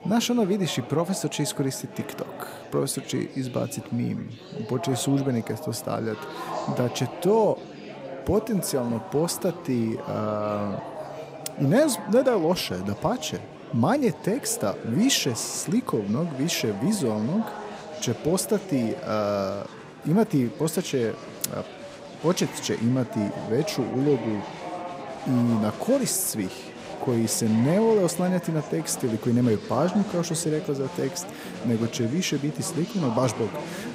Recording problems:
chatter from many people; noticeable; throughout; 10 dB below the speech

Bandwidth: 15.5 kHz